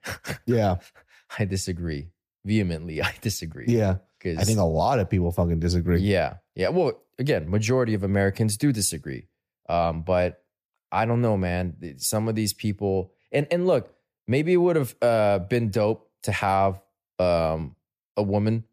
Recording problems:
none

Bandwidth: 14.5 kHz